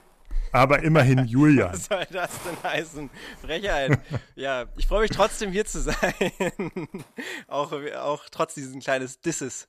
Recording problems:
hiss; faint; until 4 s and from 5.5 to 8 s; 20 dB below the speech

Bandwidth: 14.5 kHz